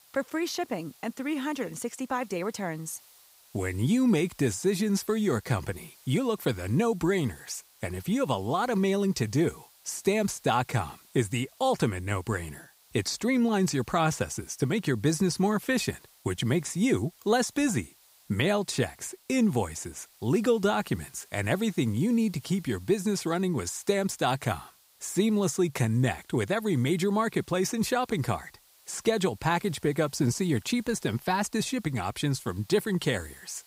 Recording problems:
hiss; faint; throughout; 25 dB below the speech

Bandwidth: 15.5 kHz